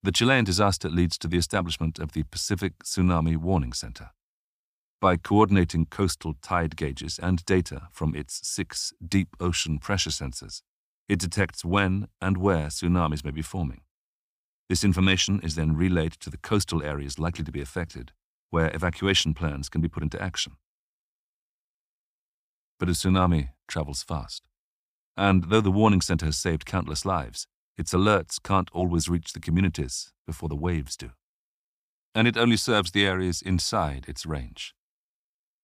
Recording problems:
none

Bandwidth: 15 kHz